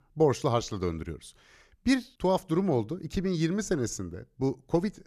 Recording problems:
none

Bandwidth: 14.5 kHz